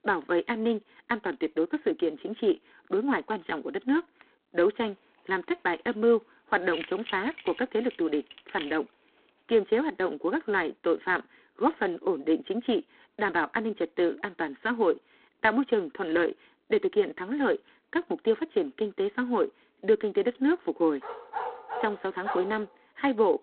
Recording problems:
phone-call audio; poor line; nothing above 3.5 kHz
jangling keys; noticeable; from 6.5 to 9.5 s; peak 10 dB below the speech
dog barking; noticeable; from 21 to 23 s; peak 6 dB below the speech

